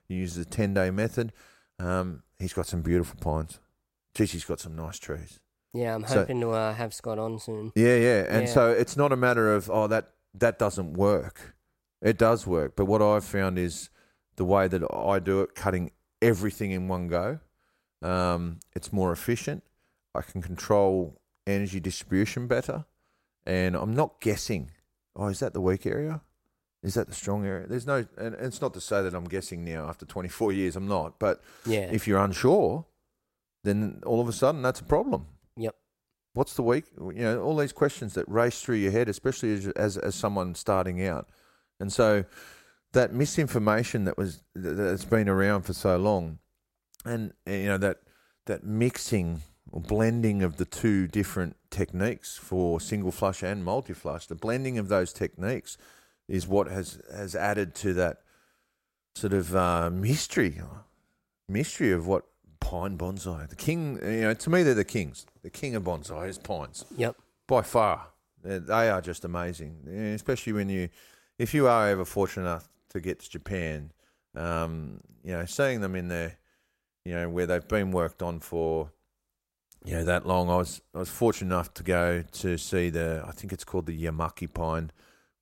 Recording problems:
none

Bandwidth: 16 kHz